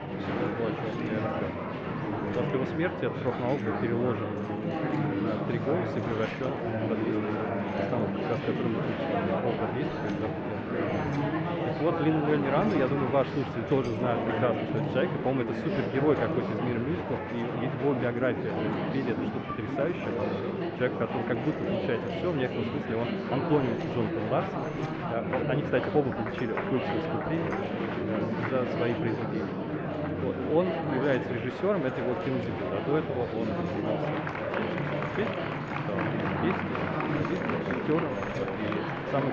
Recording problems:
muffled; very; fading above 2.5 kHz
high frequencies cut off; slight; nothing above 8 kHz
murmuring crowd; very loud; throughout; 1 dB above the speech
household noises; faint; throughout; 20 dB below the speech
abrupt cut into speech; at the end

